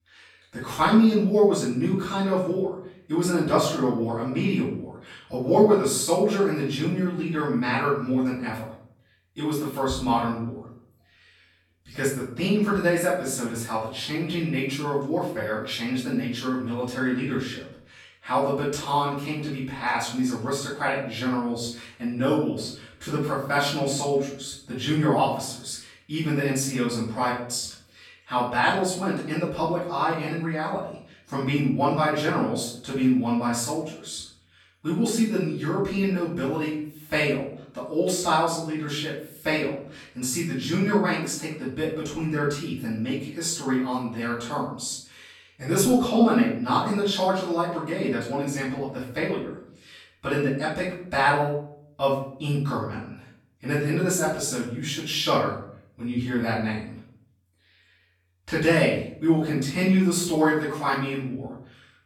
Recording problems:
off-mic speech; far
room echo; noticeable; dies away in 0.5 s

